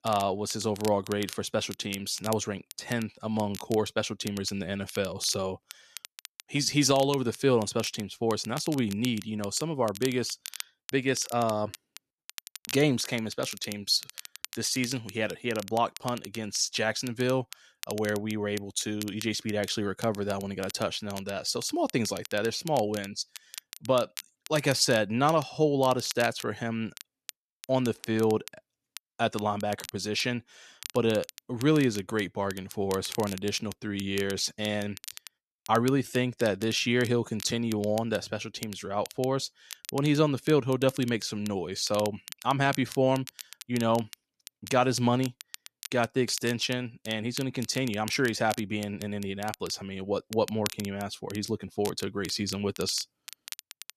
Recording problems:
crackle, like an old record; noticeable; 15 dB below the speech

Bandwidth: 13.5 kHz